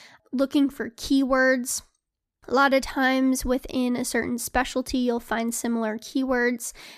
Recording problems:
none

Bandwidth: 14.5 kHz